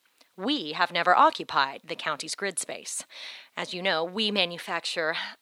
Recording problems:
thin; somewhat; fading below 500 Hz

